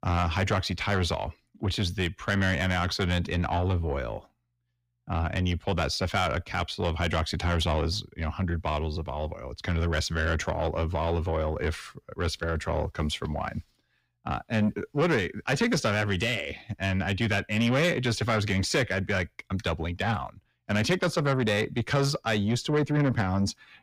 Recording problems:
distortion; slight; 10 dB below the speech

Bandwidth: 15.5 kHz